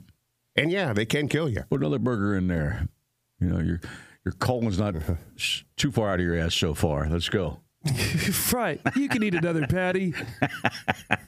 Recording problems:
squashed, flat; heavily

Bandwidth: 15 kHz